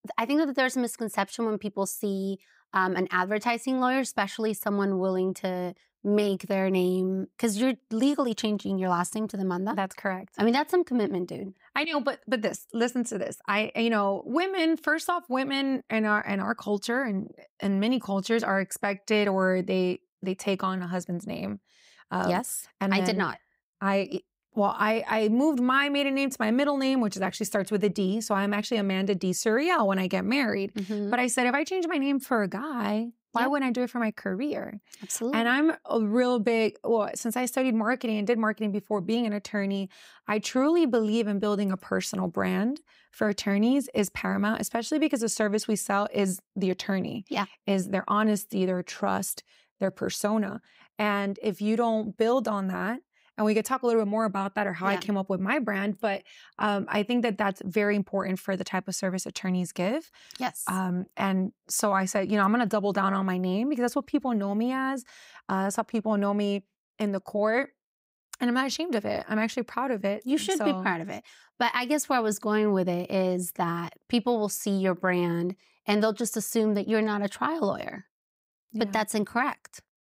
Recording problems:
none

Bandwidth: 15.5 kHz